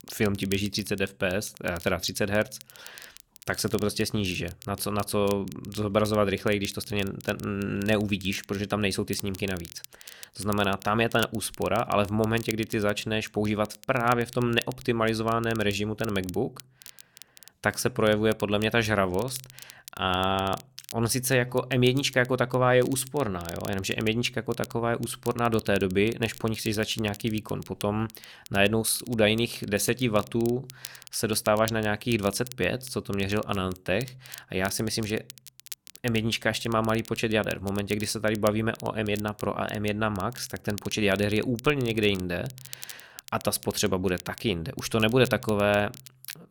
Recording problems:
crackle, like an old record; noticeable; 20 dB below the speech

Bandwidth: 18.5 kHz